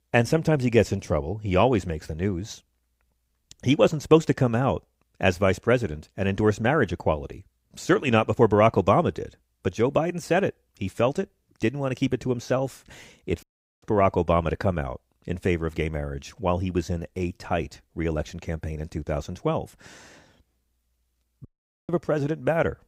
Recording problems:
audio cutting out; at 13 s and at 21 s

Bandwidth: 15.5 kHz